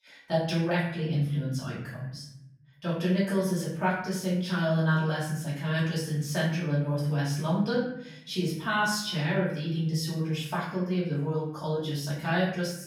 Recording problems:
off-mic speech; far
room echo; noticeable; dies away in 0.8 s

